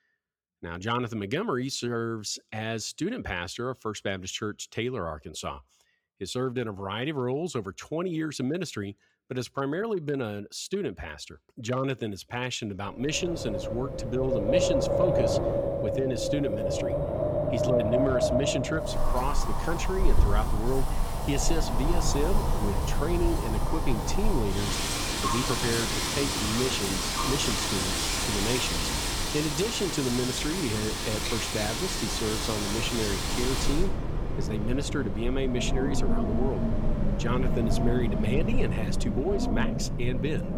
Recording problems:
wind in the background; very loud; from 13 s on; 2 dB above the speech

